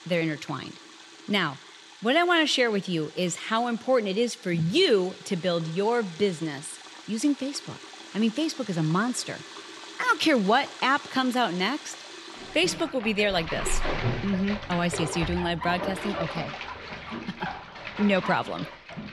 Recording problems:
household noises; noticeable; throughout; 10 dB below the speech

